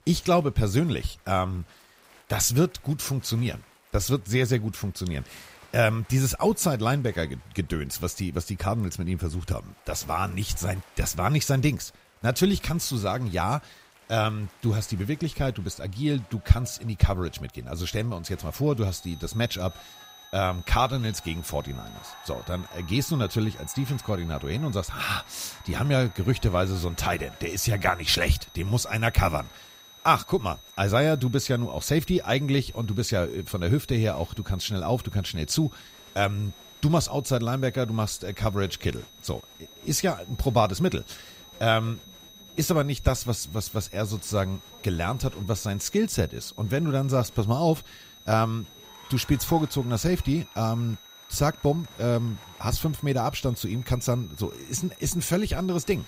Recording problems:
high-pitched whine; faint; from 19 s on; 4 kHz, 20 dB below the speech
crowd noise; faint; throughout; 25 dB below the speech

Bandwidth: 15.5 kHz